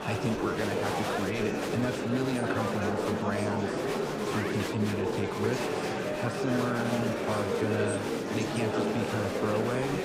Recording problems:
murmuring crowd; very loud; throughout; 3 dB above the speech

